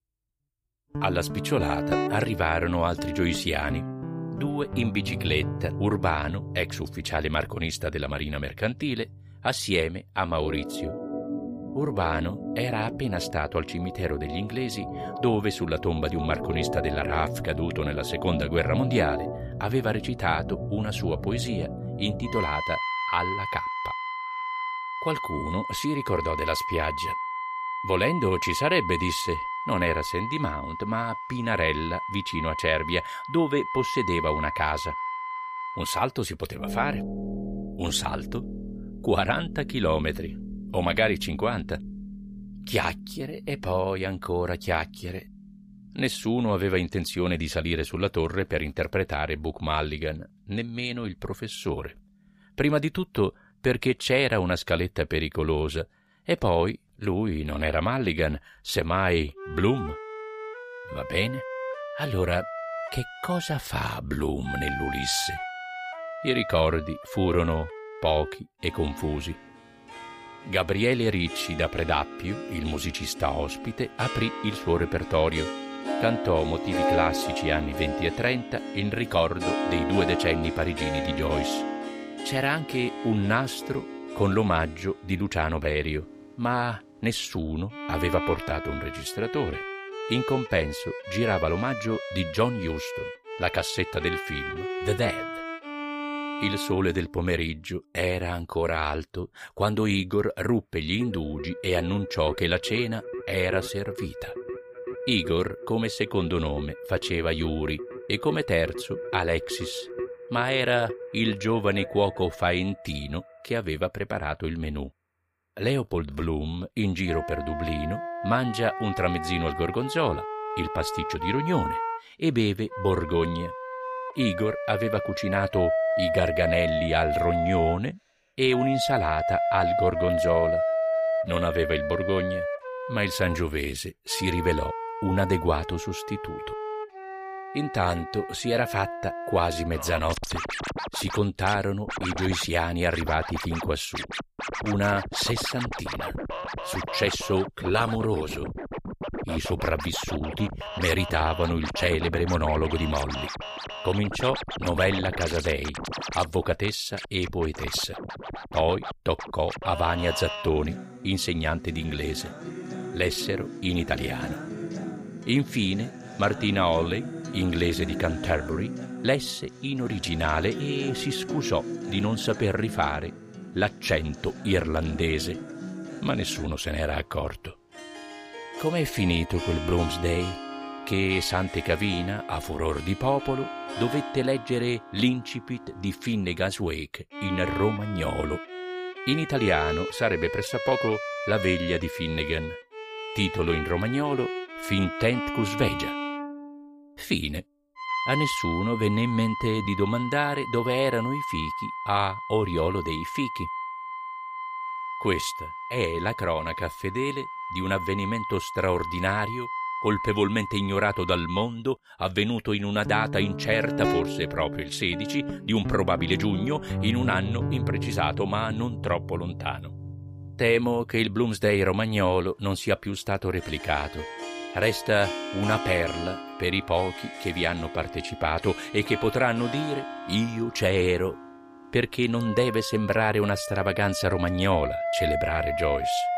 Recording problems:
background music; loud; throughout; 6 dB below the speech

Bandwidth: 15 kHz